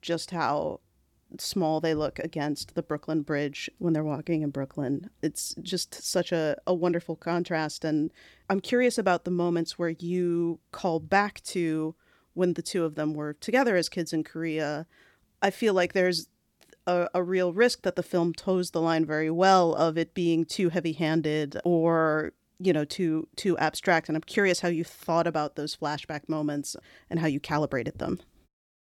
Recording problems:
none

